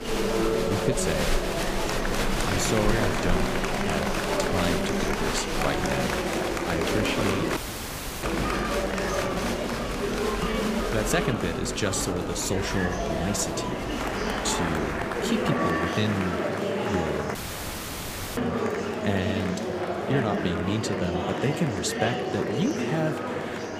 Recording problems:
murmuring crowd; very loud; throughout; 2 dB above the speech
animal sounds; loud; until 15 s; 8 dB below the speech
electrical hum; faint; throughout; 50 Hz, 25 dB below the speech
audio cutting out; at 7.5 s for 0.5 s and at 17 s for 1 s

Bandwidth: 15 kHz